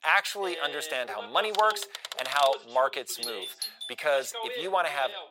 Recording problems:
thin; very; fading below 800 Hz
voice in the background; noticeable; throughout; 10 dB below the speech
keyboard typing; noticeable; from 1.5 to 2.5 s; peak 6 dB below the speech
doorbell; noticeable; at 3 s; peak 7 dB below the speech

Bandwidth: 16 kHz